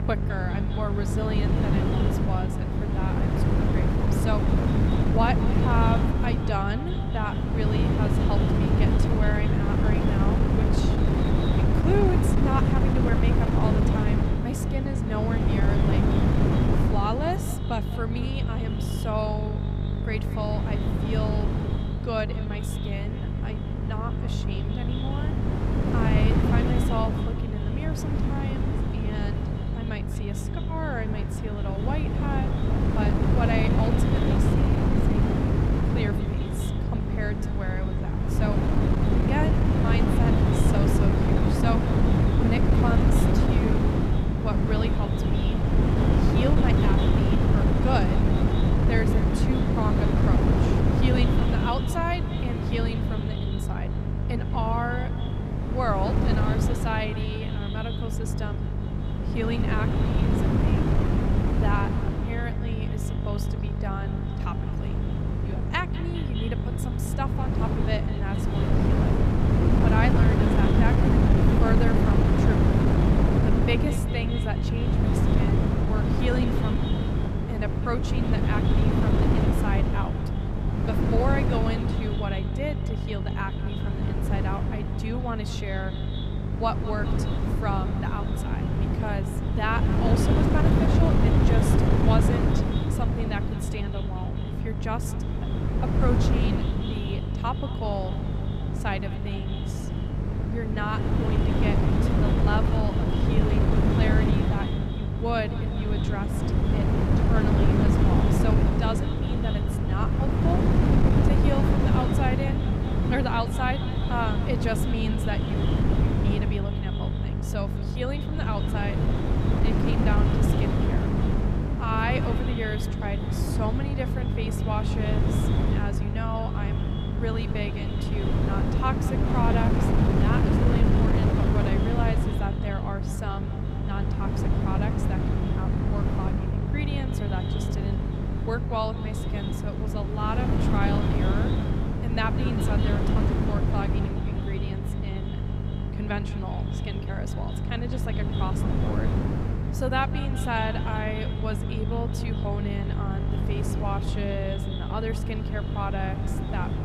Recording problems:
echo of what is said; noticeable; throughout; 200 ms later, 15 dB below the speech
wind noise on the microphone; heavy; 1 dB above the speech
electrical hum; loud; throughout; 50 Hz, 8 dB below the speech

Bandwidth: 15.5 kHz